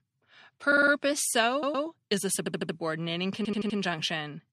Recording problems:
audio stuttering; 4 times, first at 0.5 s

